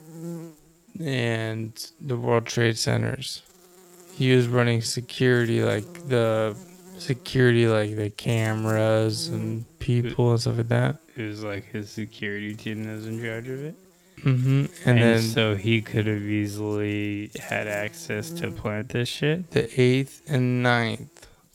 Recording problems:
wrong speed, natural pitch; too slow; 0.6 times normal speed
electrical hum; faint; throughout; 50 Hz, 25 dB below the speech

